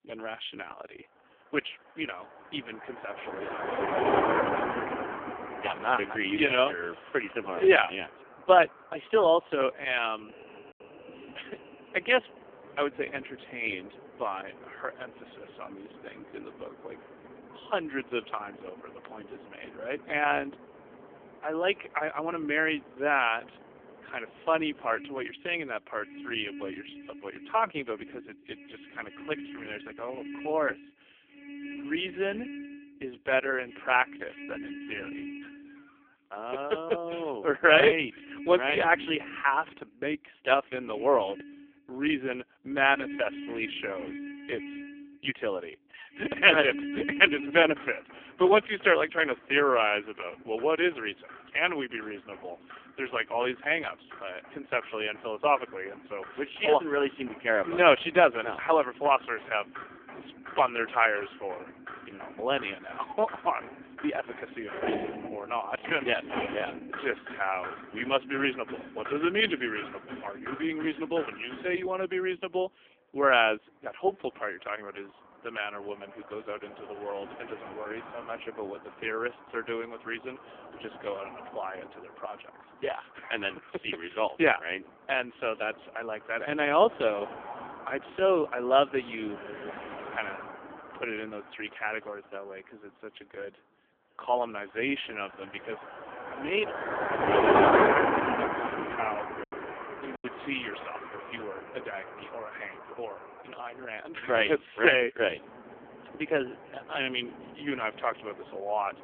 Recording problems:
phone-call audio; poor line; nothing above 3.5 kHz
traffic noise; loud; throughout; 6 dB below the speech
choppy; occasionally; at 1:40; 1% of the speech affected

